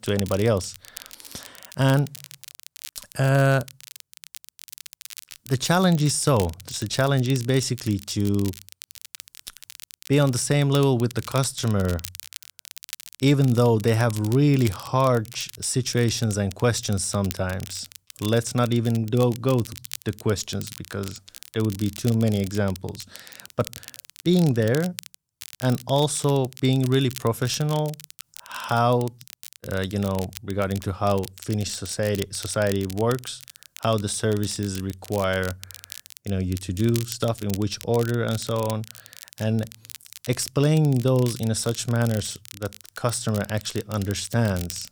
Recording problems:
crackle, like an old record; noticeable; 15 dB below the speech

